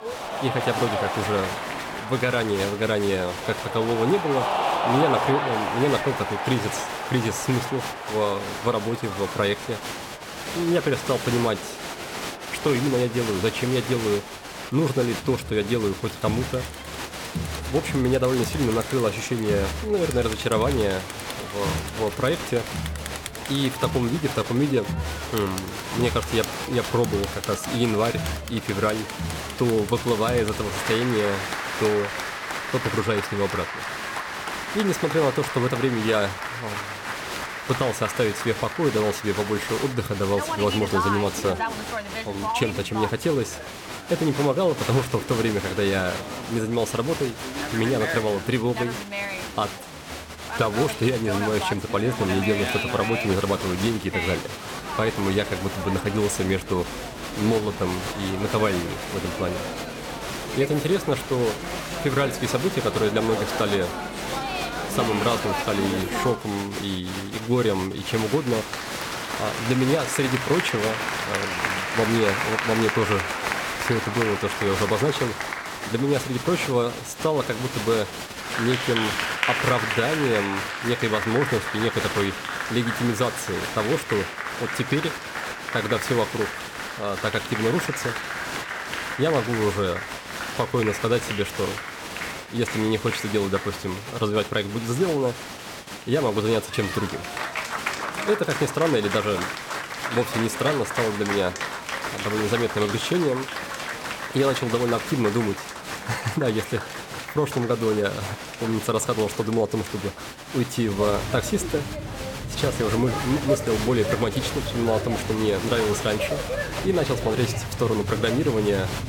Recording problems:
crowd noise; loud; throughout; 4 dB below the speech

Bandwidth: 17 kHz